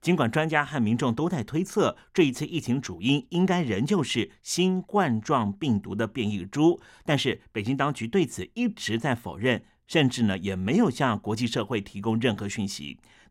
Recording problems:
none

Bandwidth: 16.5 kHz